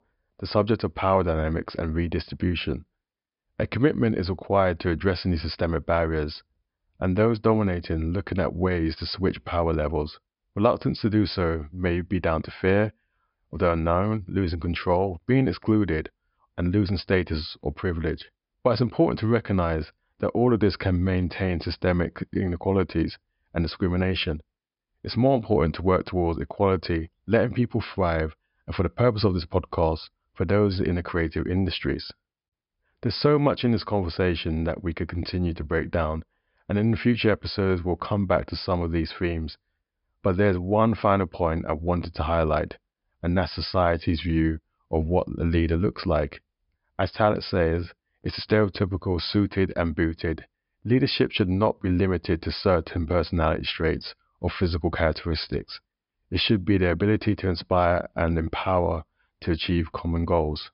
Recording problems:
high frequencies cut off; noticeable; nothing above 5.5 kHz

